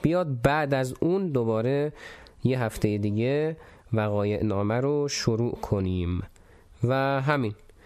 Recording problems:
squashed, flat; somewhat

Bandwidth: 14.5 kHz